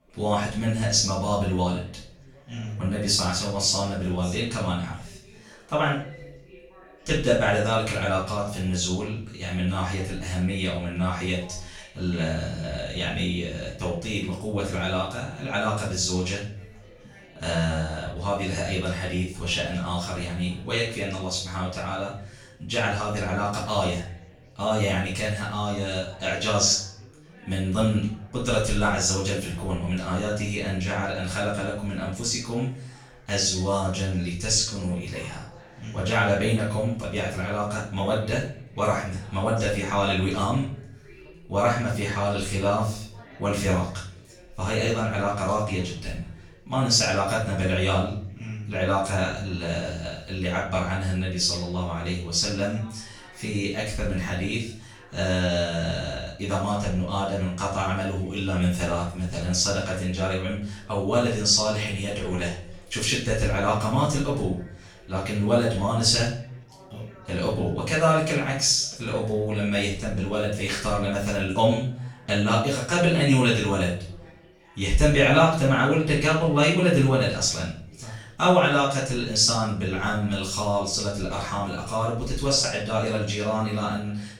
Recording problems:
off-mic speech; far
room echo; noticeable; dies away in 0.5 s
background chatter; faint; throughout; 4 voices, 25 dB below the speech

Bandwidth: 17 kHz